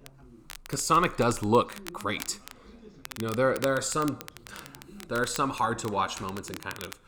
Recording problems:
crackle, like an old record; noticeable; 15 dB below the speech
background chatter; faint; throughout; 2 voices, 25 dB below the speech

